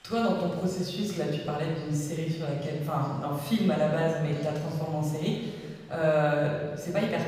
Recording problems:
off-mic speech; far
room echo; noticeable; dies away in 1.5 s
chatter from many people; faint; throughout; 20 dB below the speech

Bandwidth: 15.5 kHz